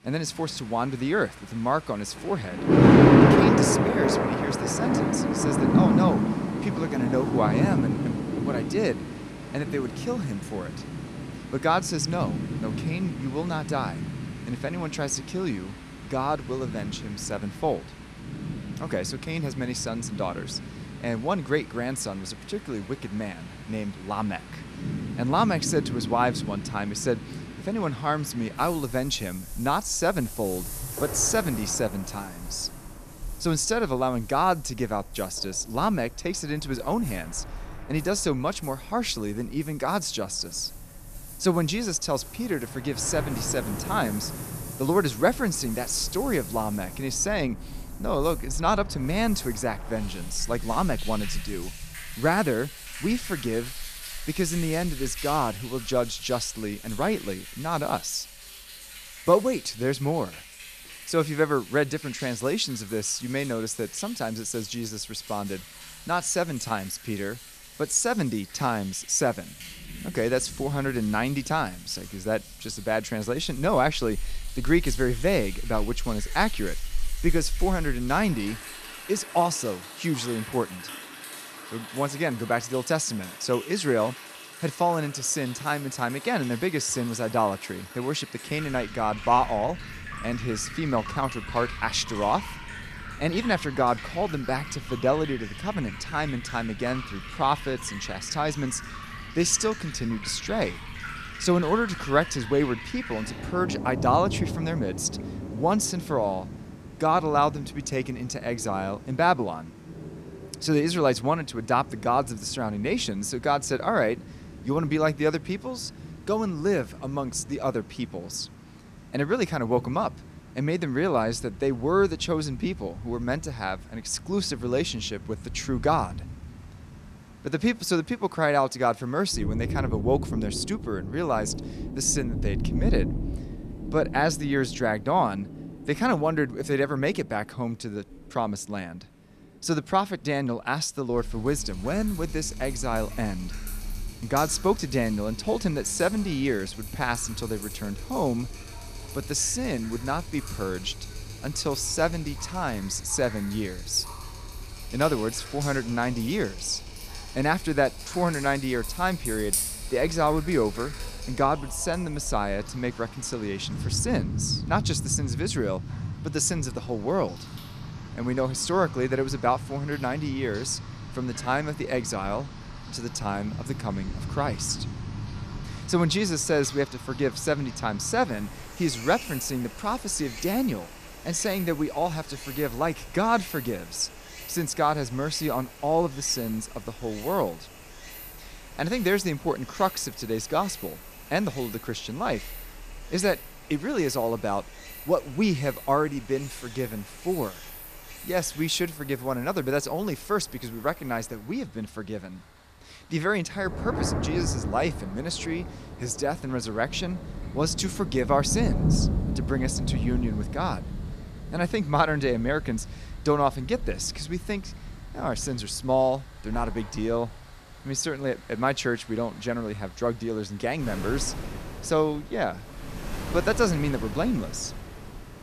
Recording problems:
rain or running water; loud; throughout; 6 dB below the speech

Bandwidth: 14.5 kHz